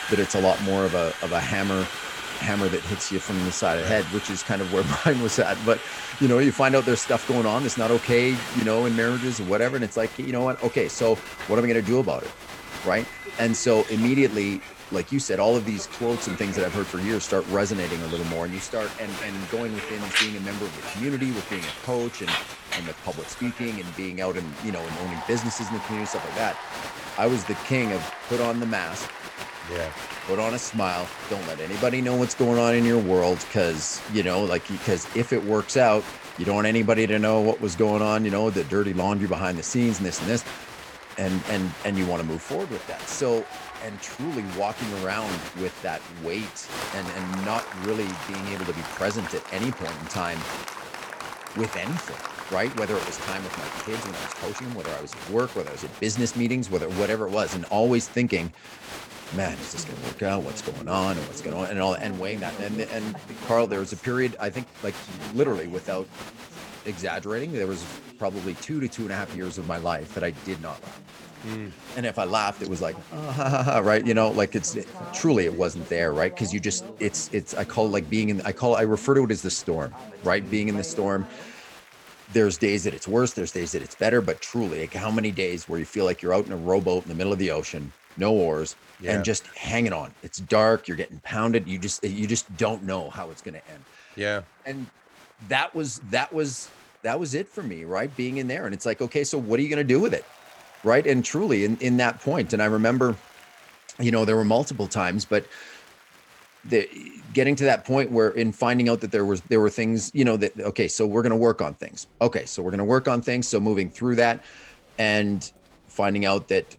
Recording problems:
crowd noise; noticeable; throughout; 10 dB below the speech

